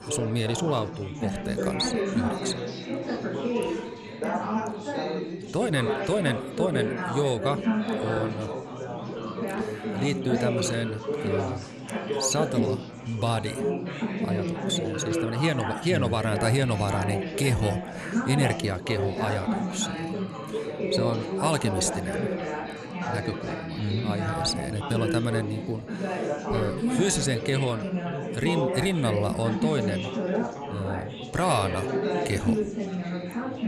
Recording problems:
chatter from many people; loud; throughout; 1 dB below the speech

